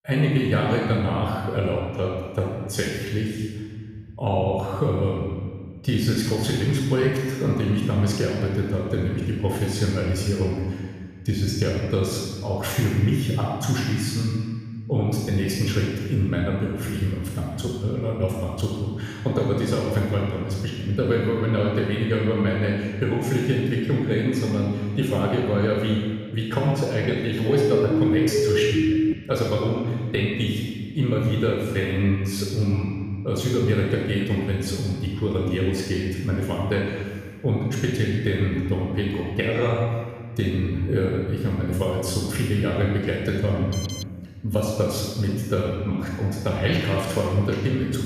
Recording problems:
room echo; strong; dies away in 1.7 s
off-mic speech; far
siren; loud; from 27 to 29 s; peak 3 dB above the speech
alarm; noticeable; at 44 s; peak 10 dB below the speech

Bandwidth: 14.5 kHz